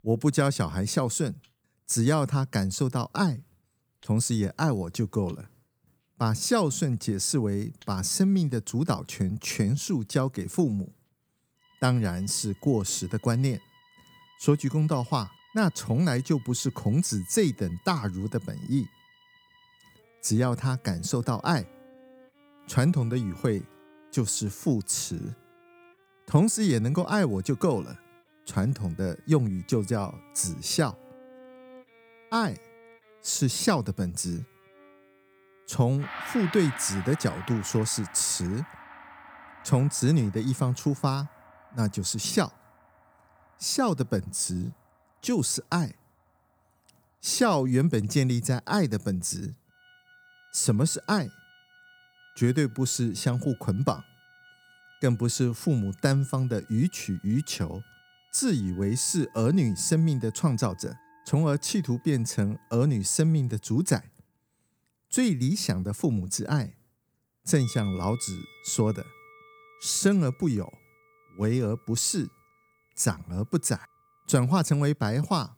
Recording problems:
background music; faint; throughout; 25 dB below the speech

